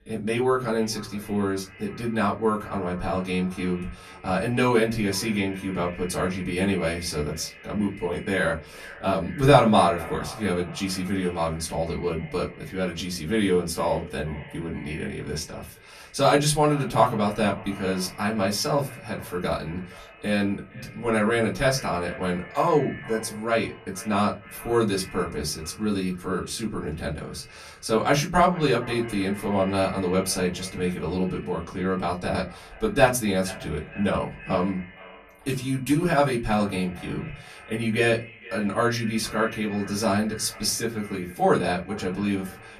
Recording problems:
off-mic speech; far
echo of what is said; noticeable; throughout; 460 ms later, 20 dB below the speech
room echo; very slight; dies away in 0.2 s

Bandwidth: 14.5 kHz